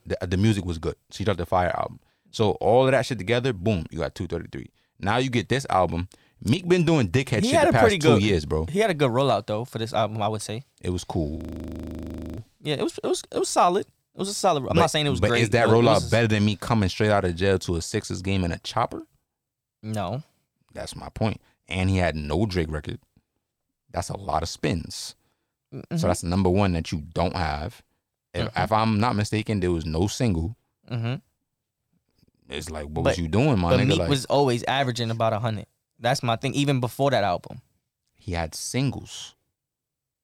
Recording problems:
audio freezing; at 11 s for 1 s

